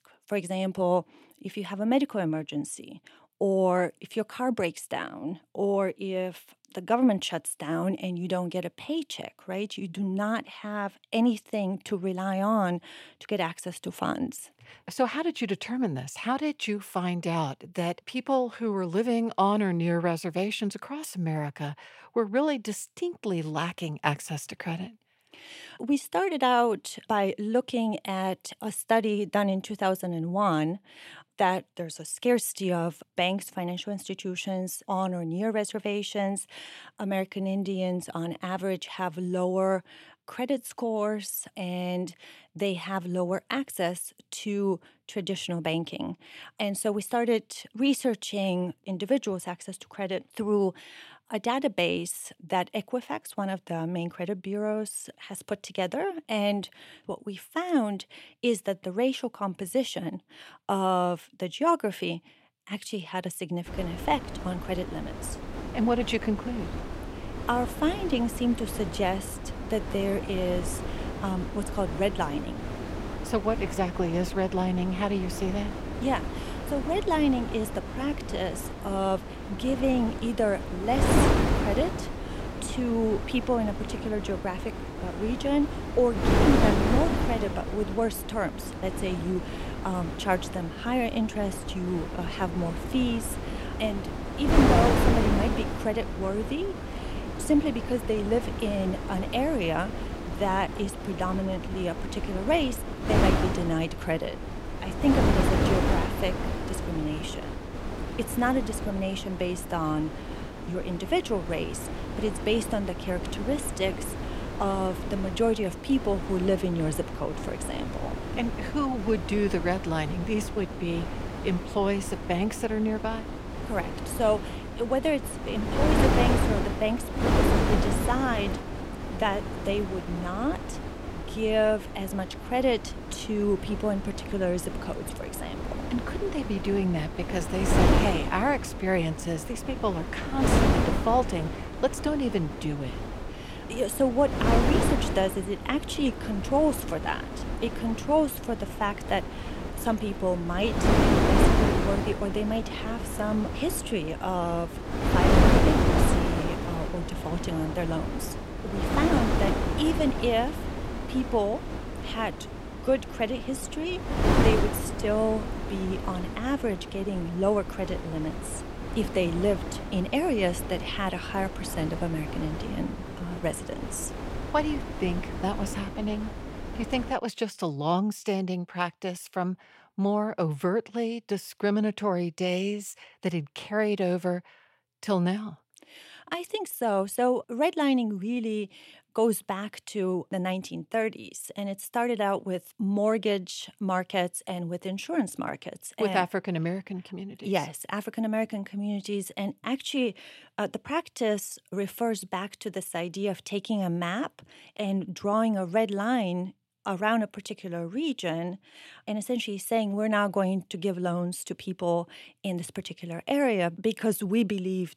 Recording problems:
wind noise on the microphone; heavy; from 1:04 to 2:57; 4 dB below the speech

